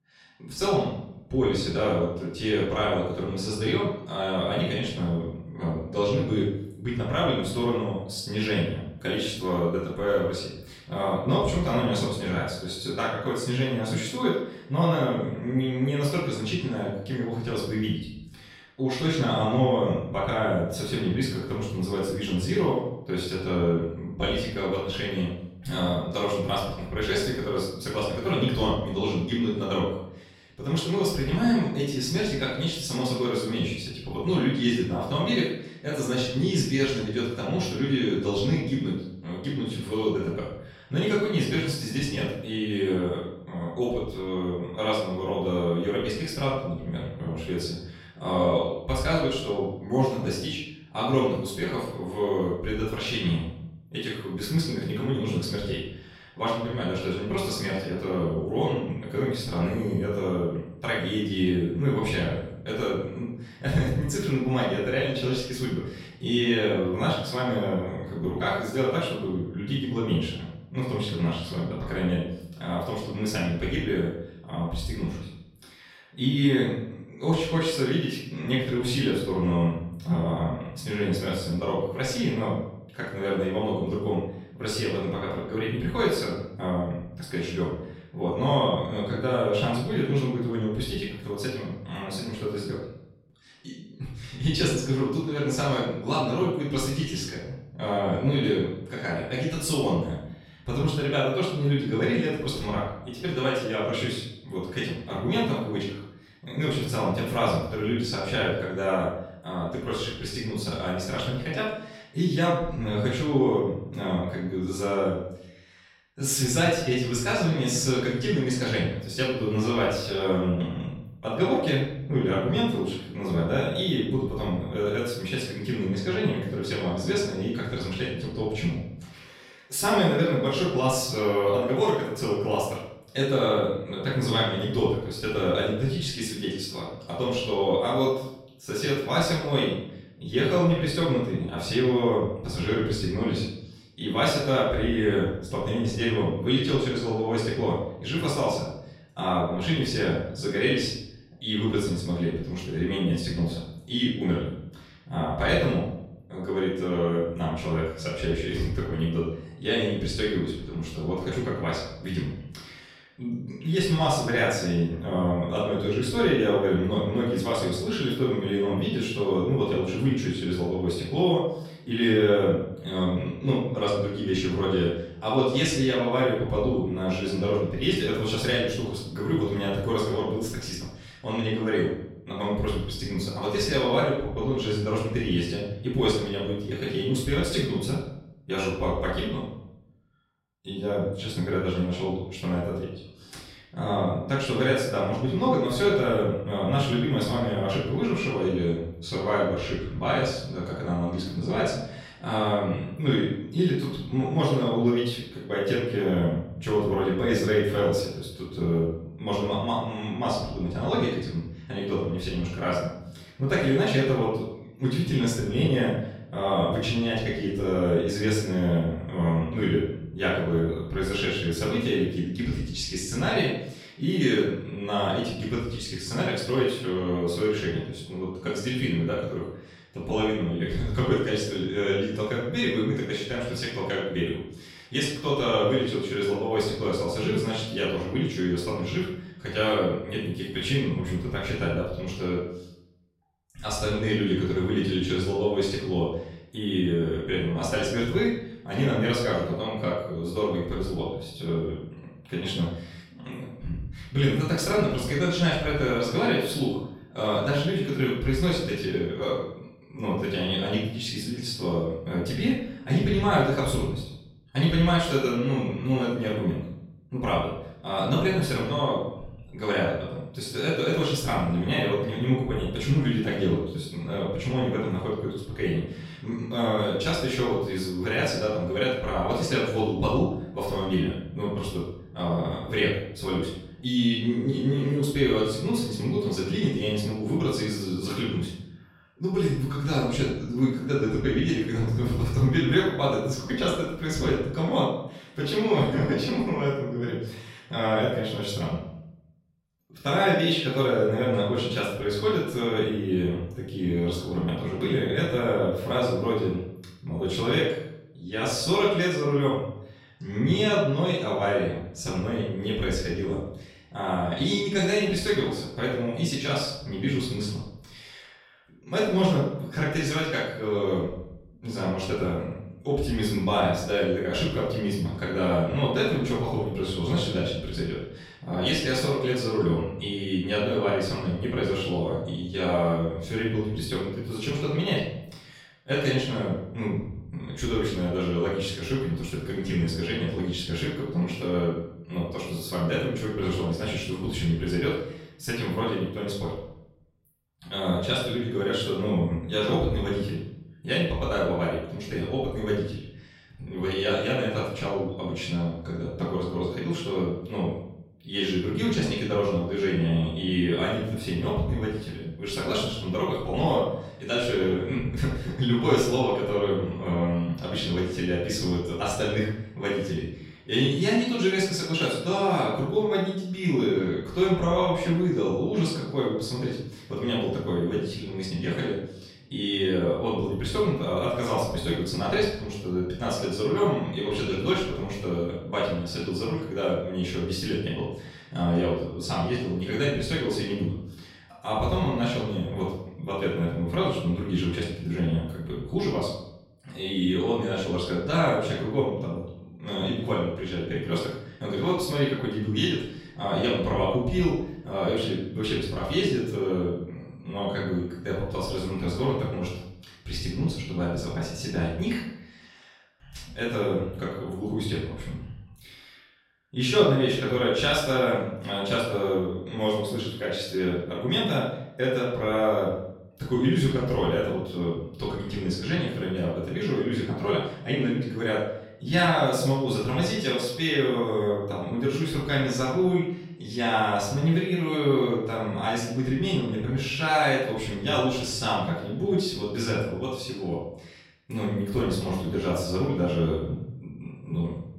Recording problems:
off-mic speech; far
room echo; noticeable; dies away in 0.7 s

